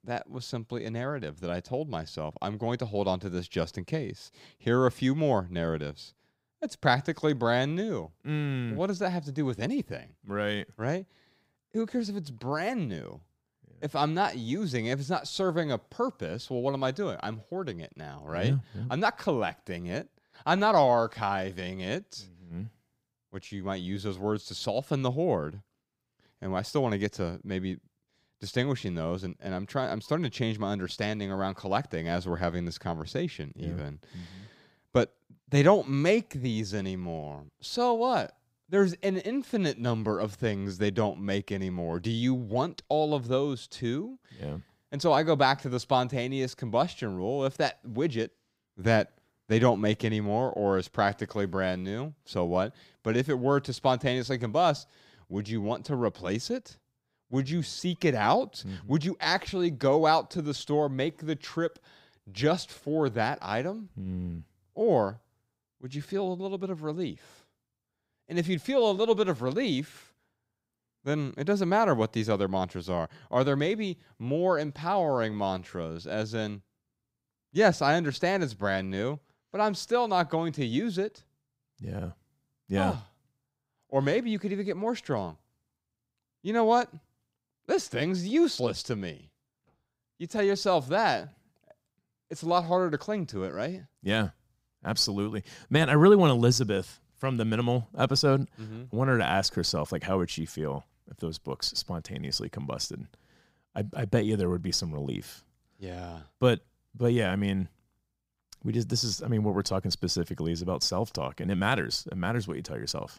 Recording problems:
none

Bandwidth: 15.5 kHz